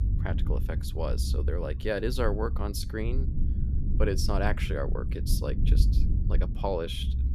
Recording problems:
low rumble; noticeable; throughout; 10 dB below the speech

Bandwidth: 14.5 kHz